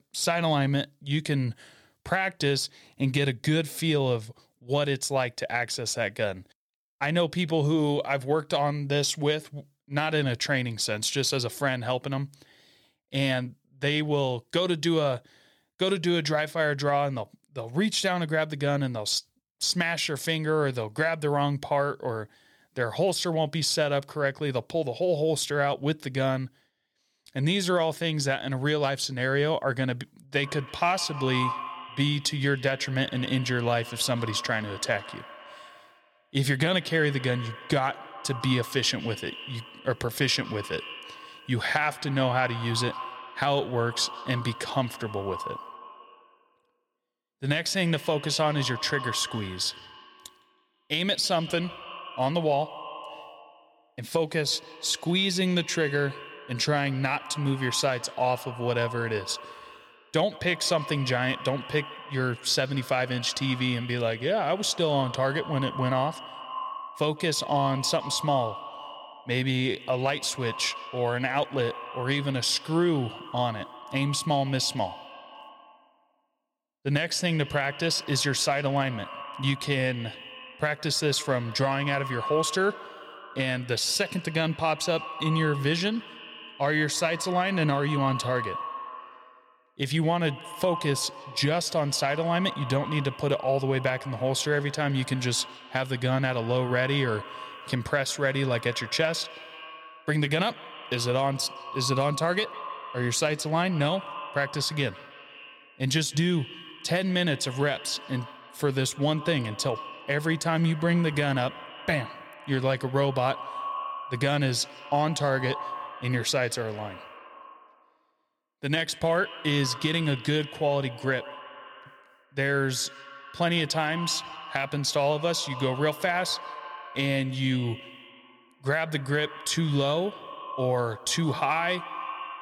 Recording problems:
echo of what is said; noticeable; from 30 s on; 160 ms later, 15 dB below the speech

